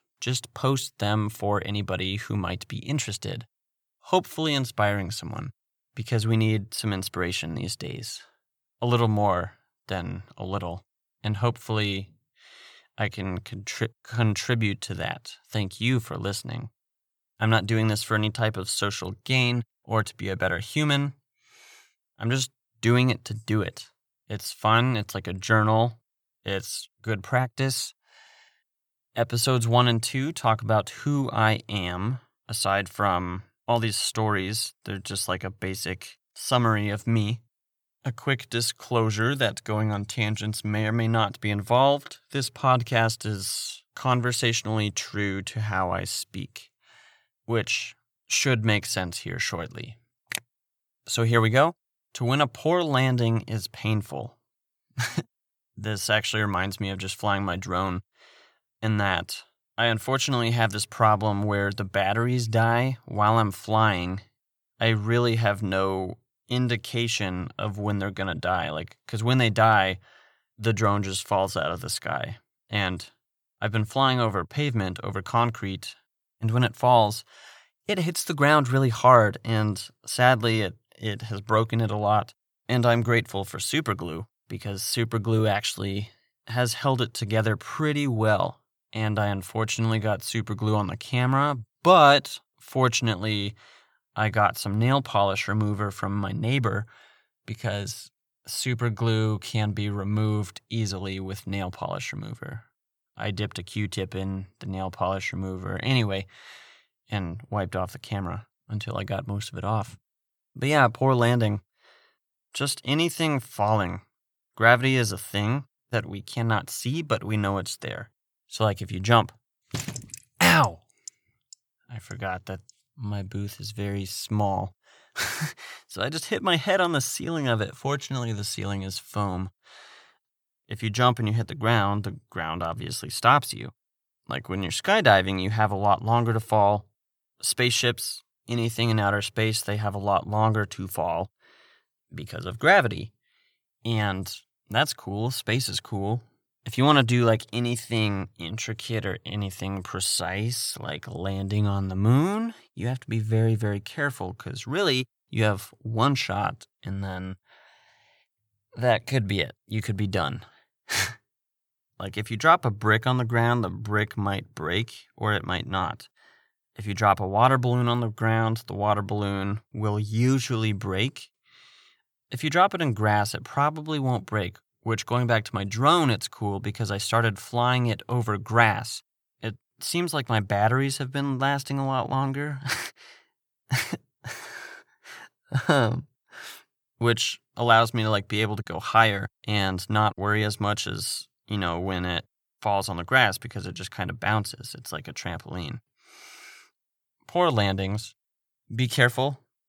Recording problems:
none

